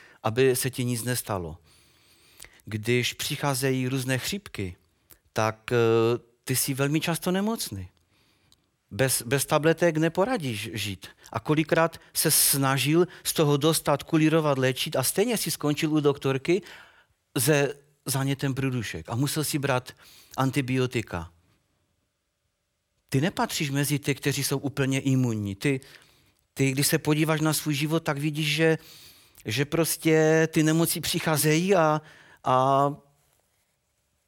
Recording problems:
none

